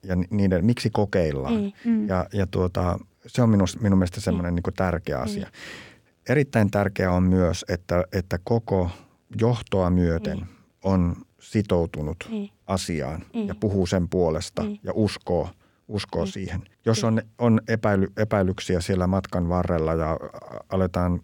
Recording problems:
none

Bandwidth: 17 kHz